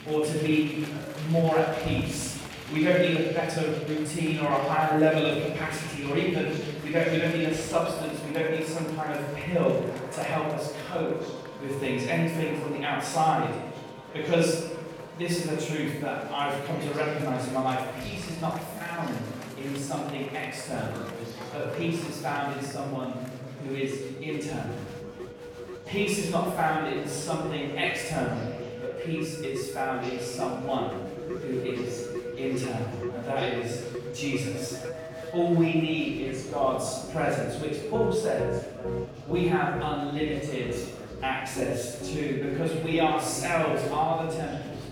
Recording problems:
room echo; strong; dies away in 1 s
off-mic speech; far
background music; noticeable; throughout; 10 dB below the speech
murmuring crowd; noticeable; throughout; 15 dB below the speech

